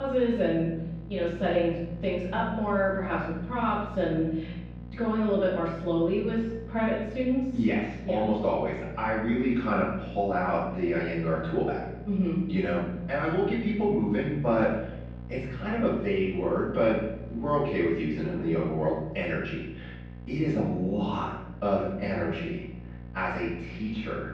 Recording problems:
off-mic speech; far
room echo; noticeable; dies away in 0.8 s
muffled; slightly; fading above 3.5 kHz
electrical hum; faint; throughout; 60 Hz, 20 dB below the speech
abrupt cut into speech; at the start

